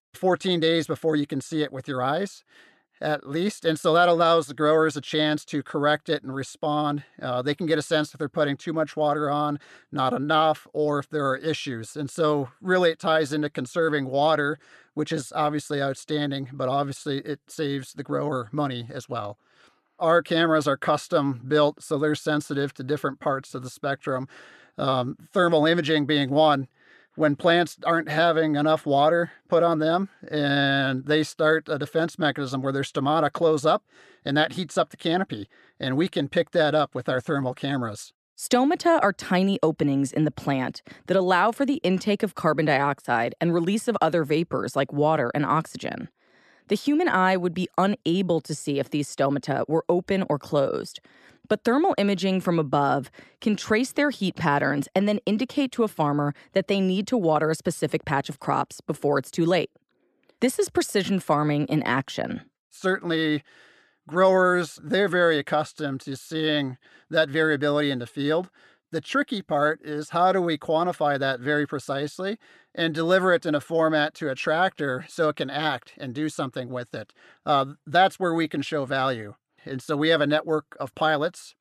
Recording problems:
none

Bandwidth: 13.5 kHz